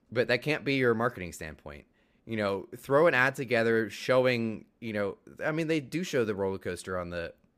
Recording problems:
none

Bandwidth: 15 kHz